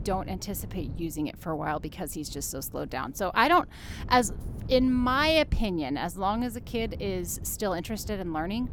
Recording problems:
wind noise on the microphone; occasional gusts; 25 dB below the speech

